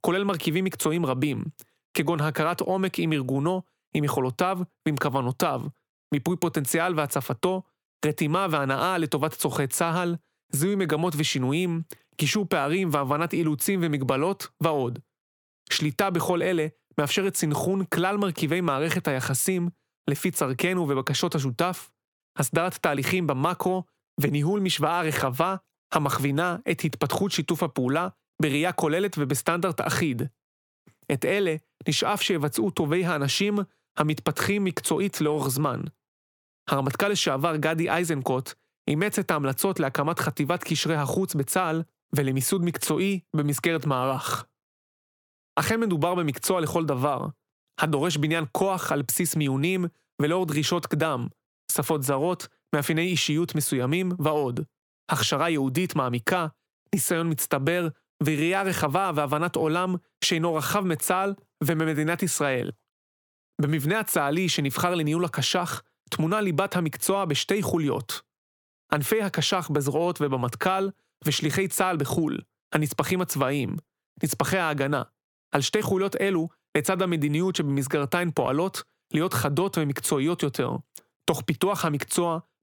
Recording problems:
squashed, flat; somewhat

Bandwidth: 18.5 kHz